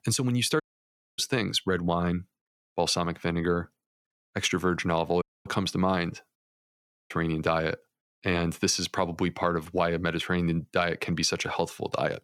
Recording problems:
audio cutting out; at 0.5 s for 0.5 s, at 5 s and at 6.5 s for 0.5 s

